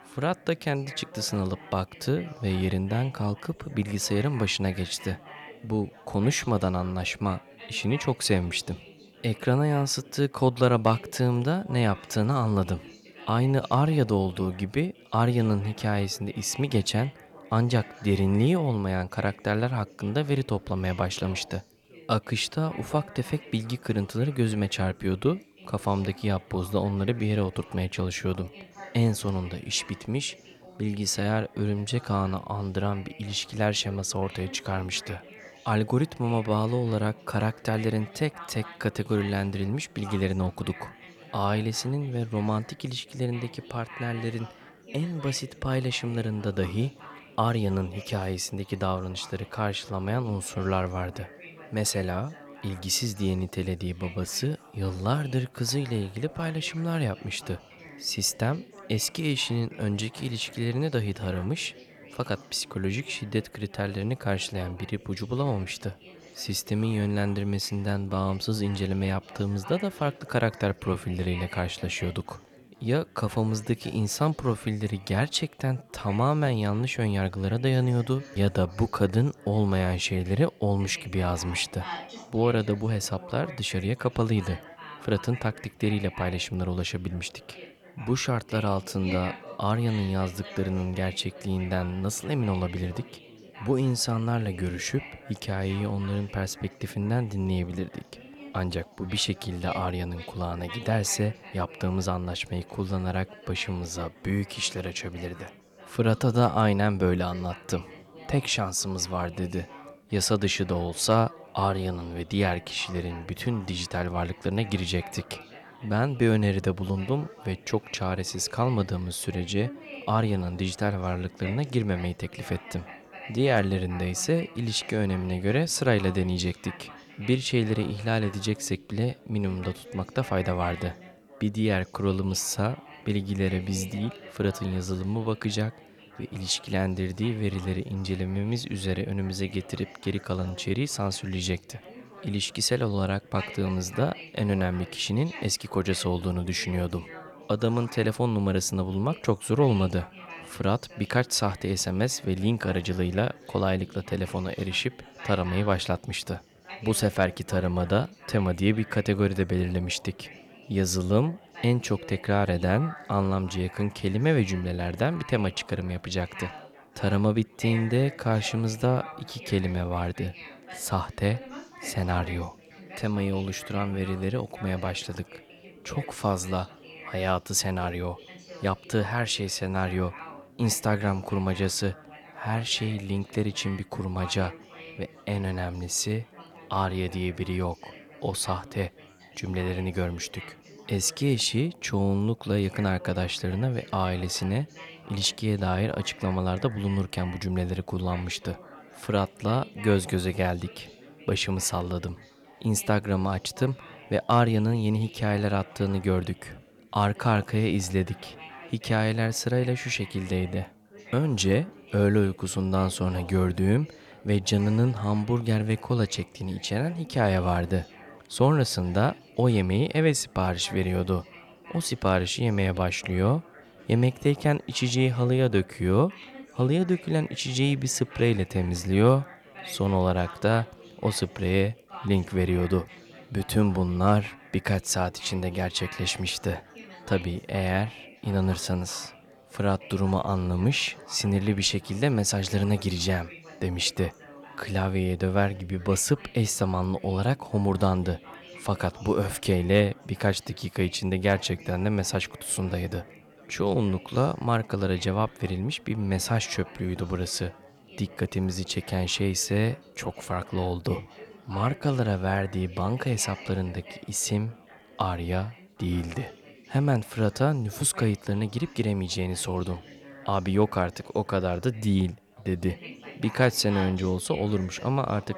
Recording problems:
chatter from many people; noticeable; throughout; 20 dB below the speech

